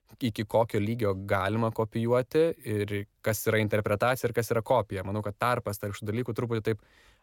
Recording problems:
none

